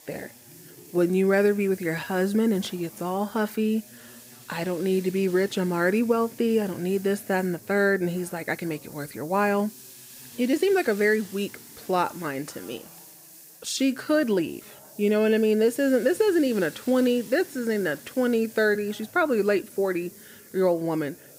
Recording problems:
hiss; noticeable; throughout; 20 dB below the speech
background chatter; faint; throughout; 3 voices, 30 dB below the speech
uneven, jittery; strongly; from 0.5 to 20 s

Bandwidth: 15.5 kHz